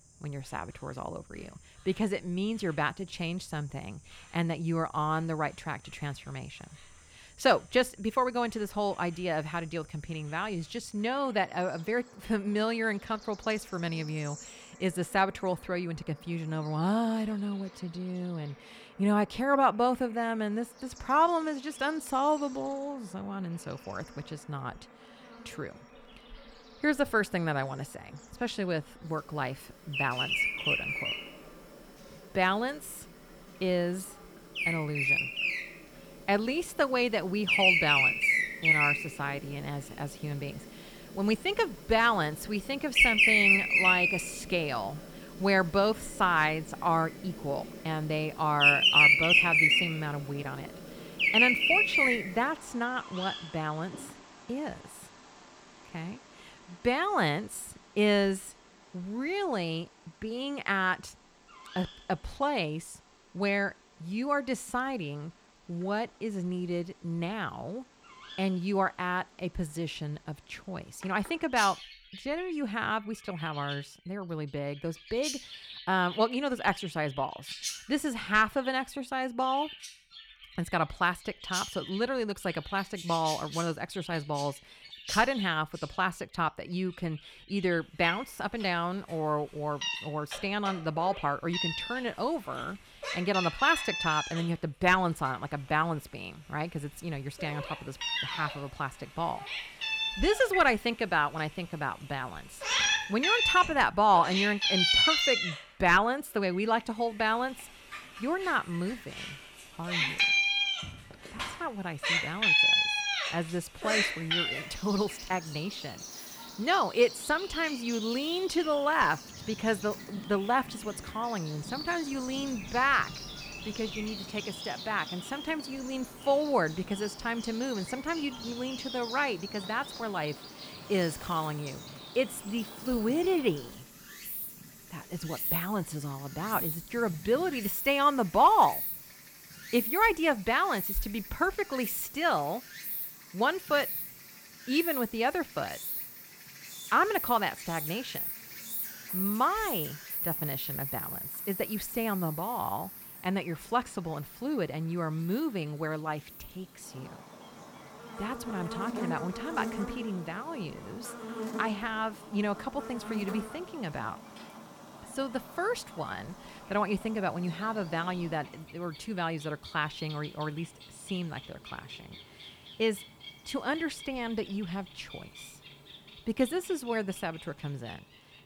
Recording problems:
animal sounds; very loud; throughout; 2 dB above the speech

